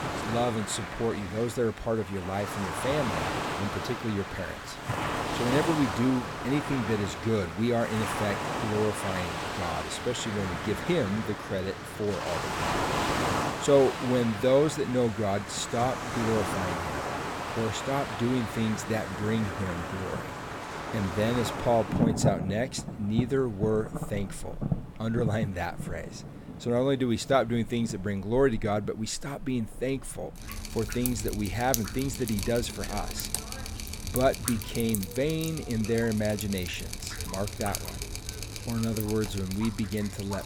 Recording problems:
rain or running water; loud; throughout; 4 dB below the speech

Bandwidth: 18 kHz